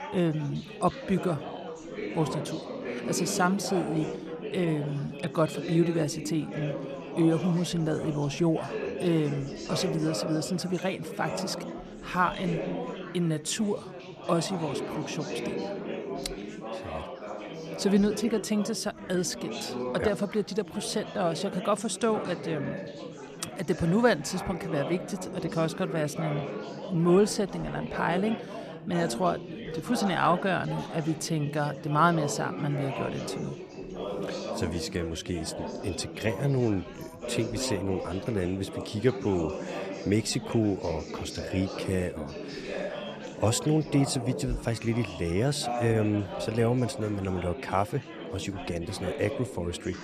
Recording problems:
chatter from many people; loud; throughout; 7 dB below the speech

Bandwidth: 14 kHz